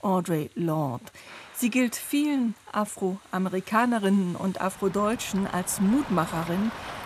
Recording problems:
rain or running water; noticeable; throughout; 15 dB below the speech

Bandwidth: 14 kHz